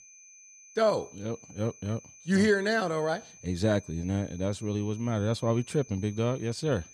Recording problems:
high-pitched whine; faint; throughout; 6 kHz, 20 dB below the speech

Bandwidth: 14.5 kHz